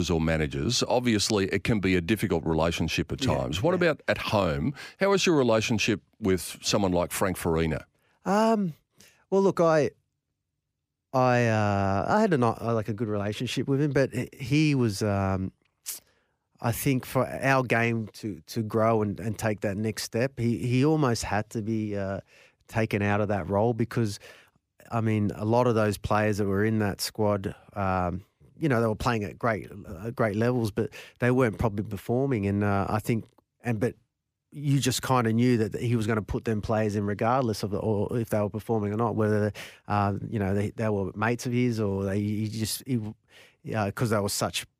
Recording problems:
abrupt cut into speech; at the start

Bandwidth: 15 kHz